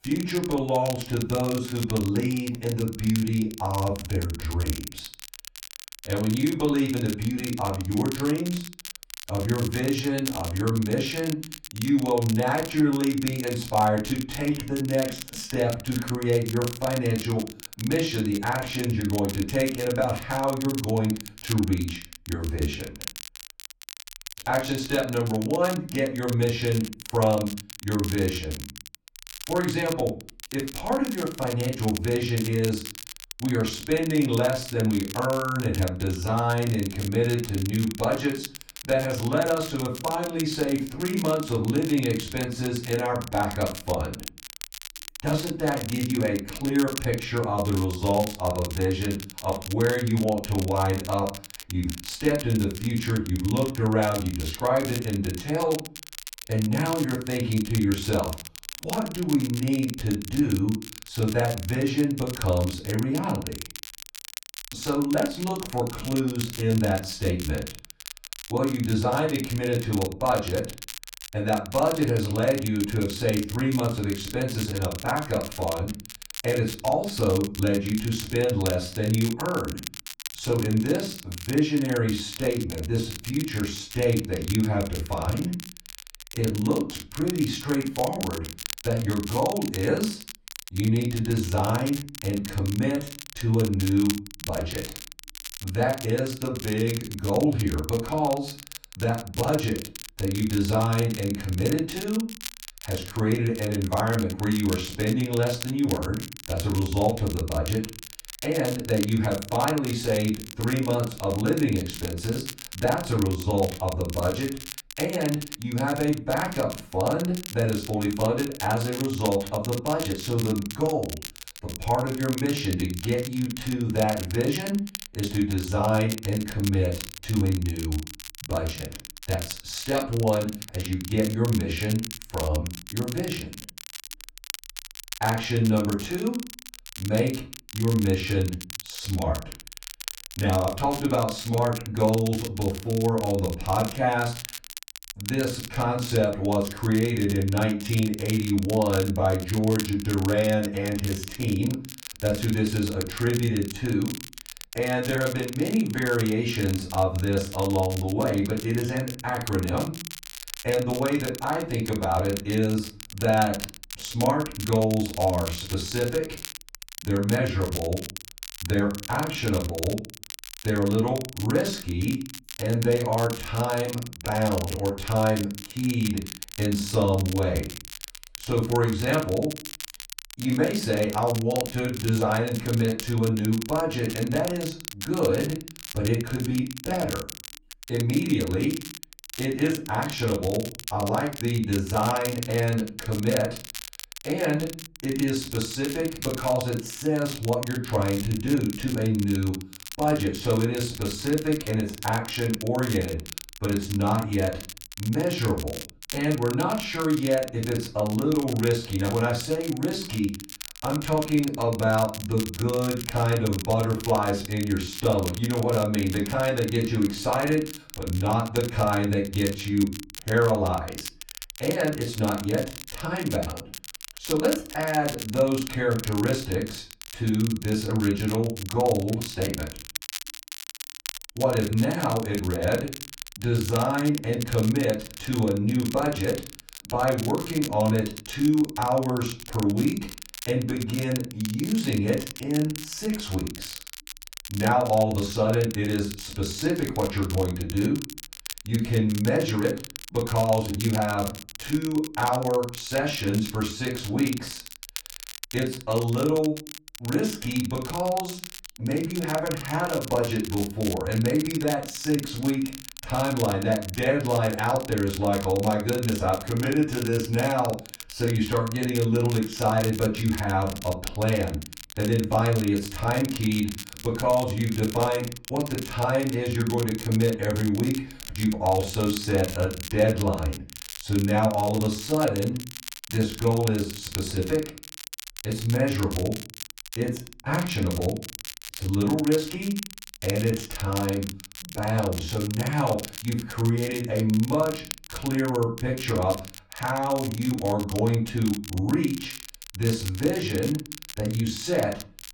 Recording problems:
off-mic speech; far
room echo; slight; dies away in 0.3 s
crackle, like an old record; noticeable; 10 dB below the speech

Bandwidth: 18 kHz